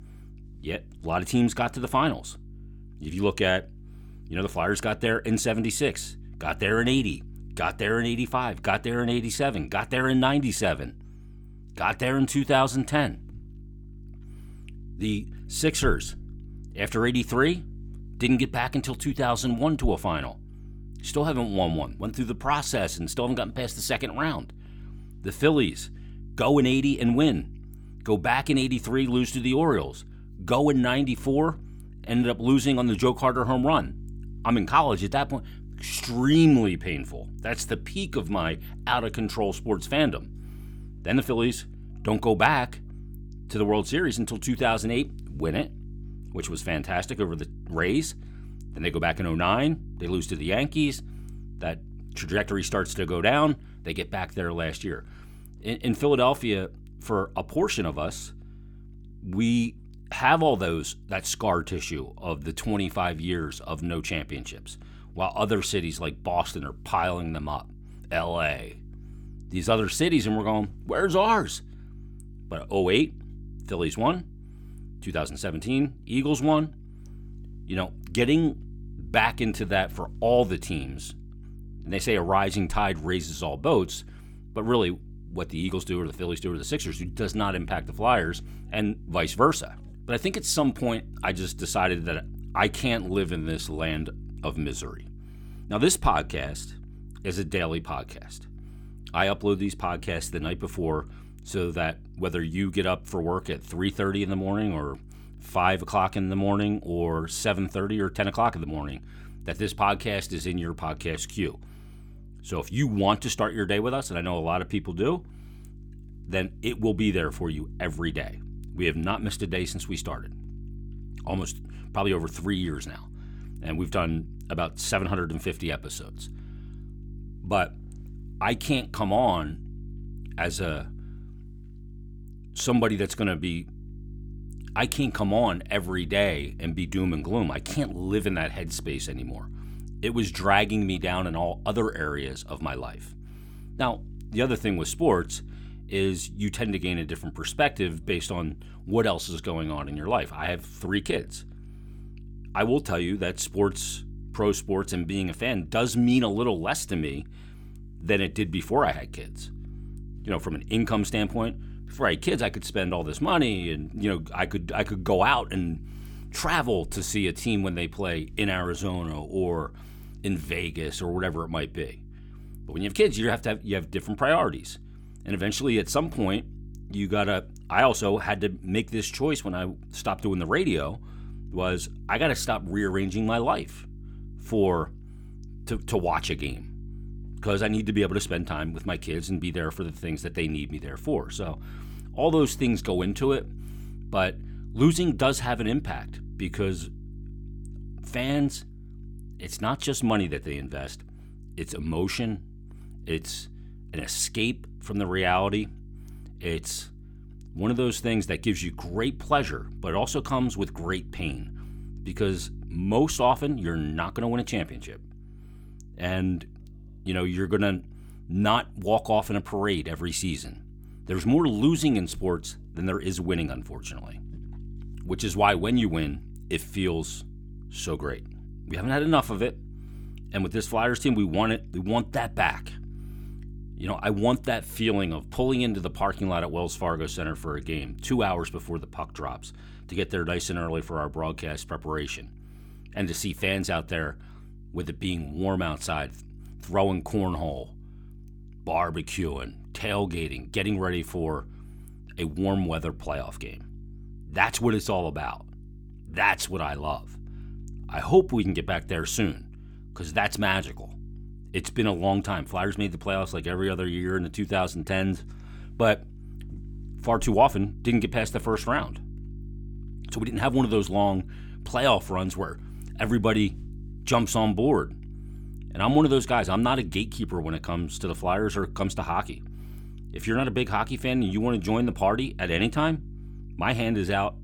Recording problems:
electrical hum; faint; throughout; 50 Hz, 30 dB below the speech

